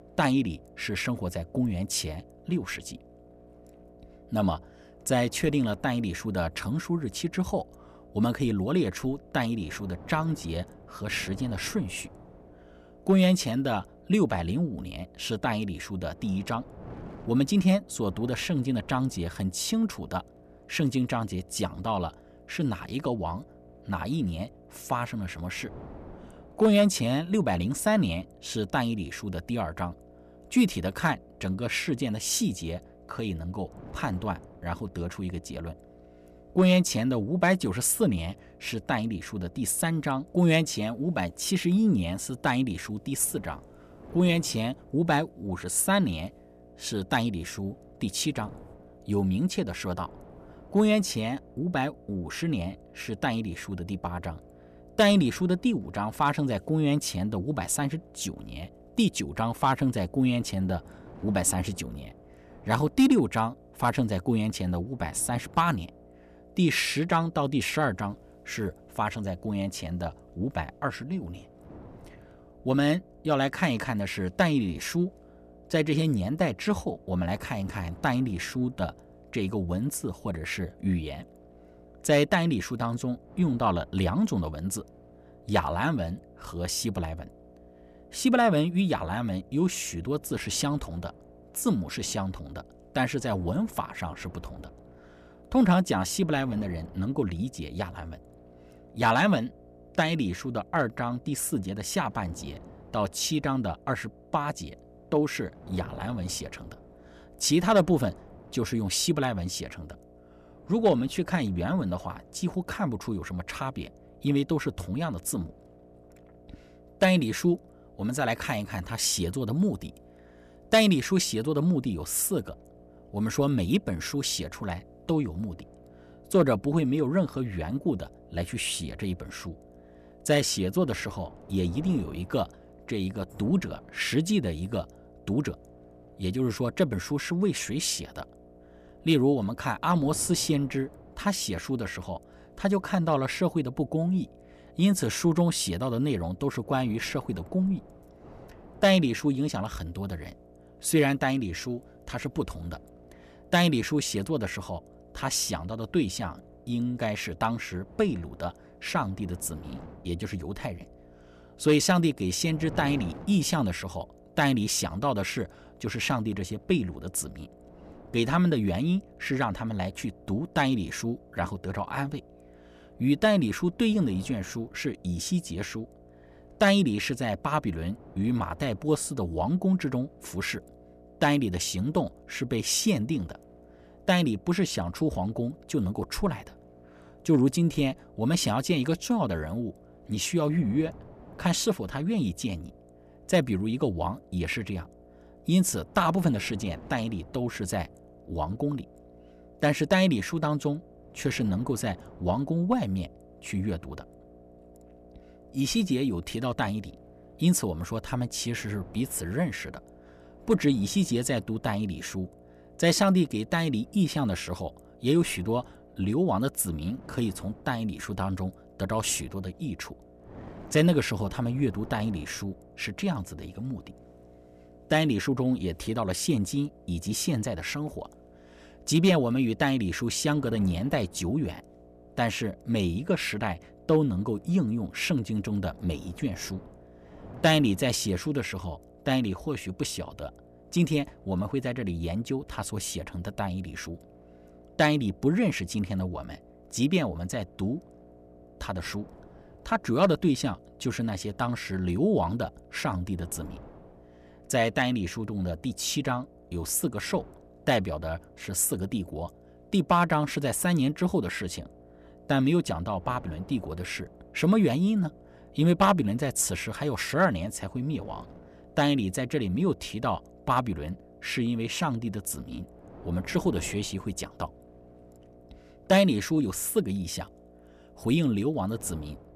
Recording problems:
wind noise on the microphone; occasional gusts; 25 dB below the speech
electrical hum; faint; throughout; 60 Hz, 25 dB below the speech

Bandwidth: 14.5 kHz